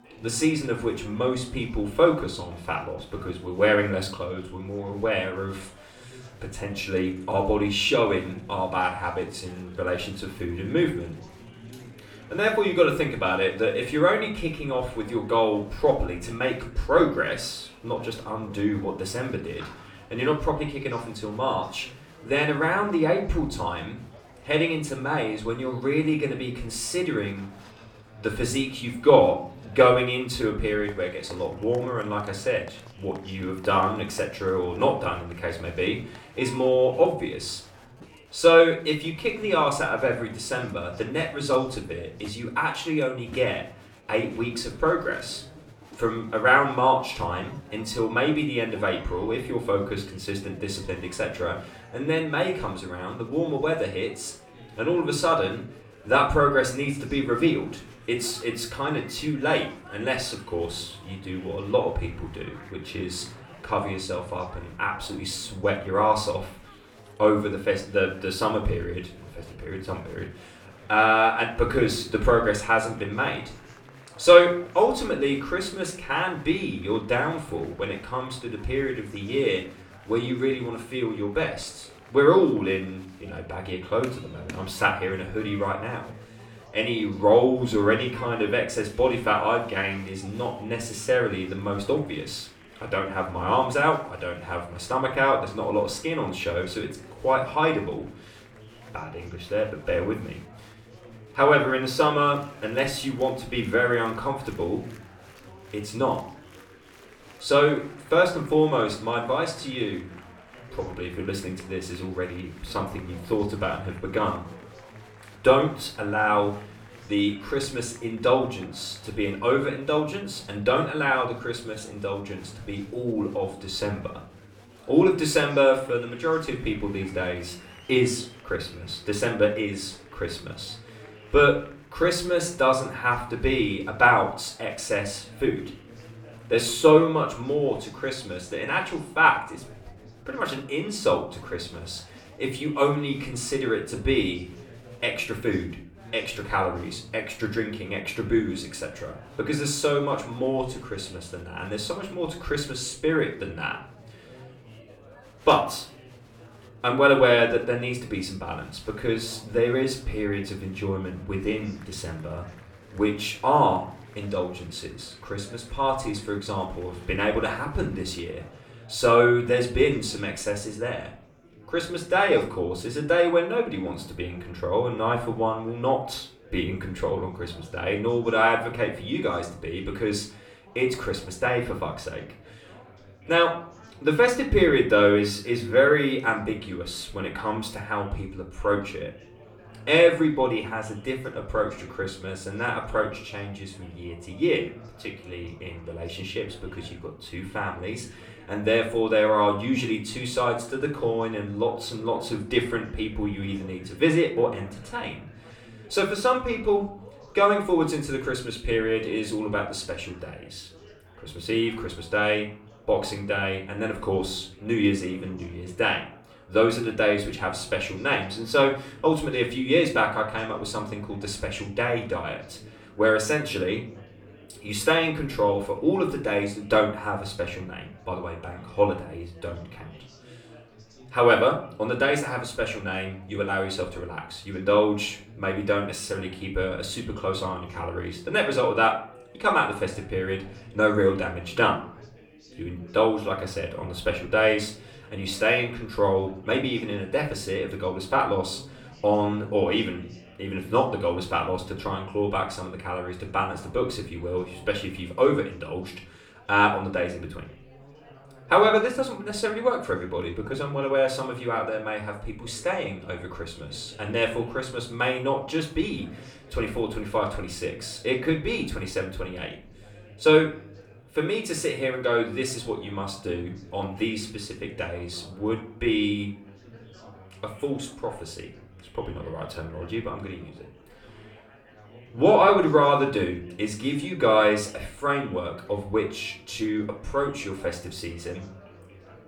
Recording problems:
off-mic speech; far
room echo; slight; dies away in 0.4 s
chatter from many people; faint; throughout; 25 dB below the speech

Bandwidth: 18 kHz